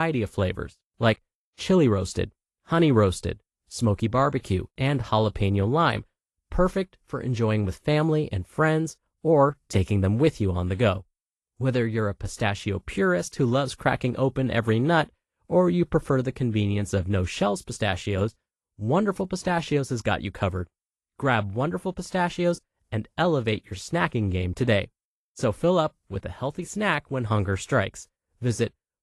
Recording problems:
garbled, watery; slightly; nothing above 11.5 kHz
abrupt cut into speech; at the start

